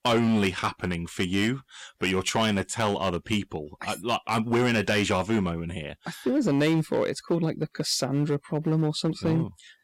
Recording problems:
distortion; slight; 6% of the sound clipped

